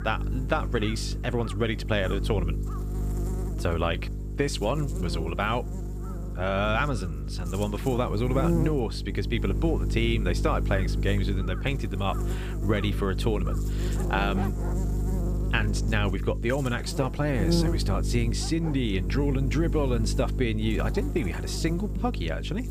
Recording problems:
electrical hum; noticeable; throughout; 50 Hz, 10 dB below the speech
animal sounds; noticeable; throughout; 20 dB below the speech

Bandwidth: 15 kHz